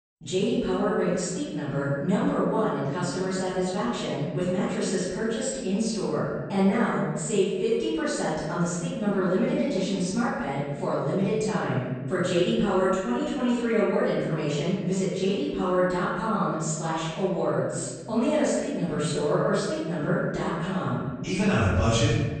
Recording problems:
room echo; strong; dies away in 1.4 s
off-mic speech; far
garbled, watery; slightly; nothing above 8.5 kHz

